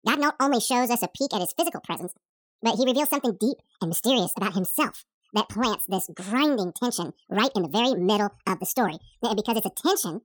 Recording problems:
wrong speed and pitch; too fast and too high; 1.8 times normal speed

